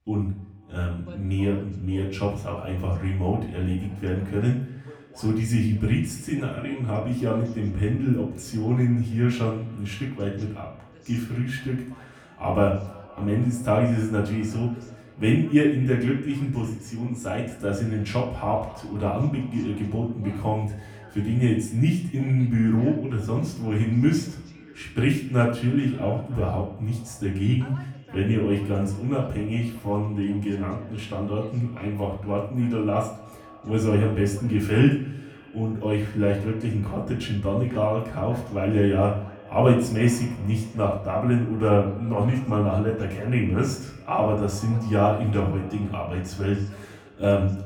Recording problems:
off-mic speech; far
echo of what is said; faint; throughout; 240 ms later, 25 dB below the speech
room echo; slight; dies away in 0.5 s
voice in the background; faint; throughout; 25 dB below the speech

